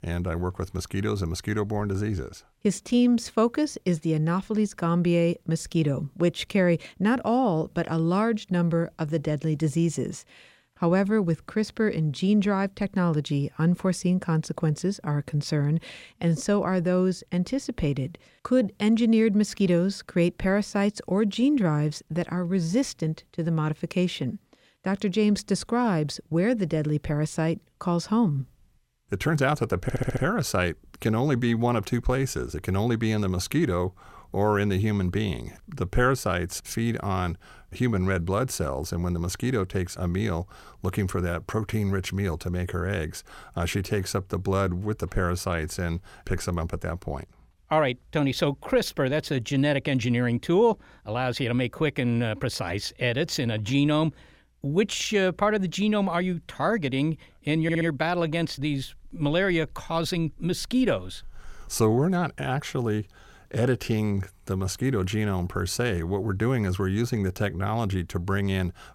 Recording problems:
audio stuttering; at 30 s and at 58 s

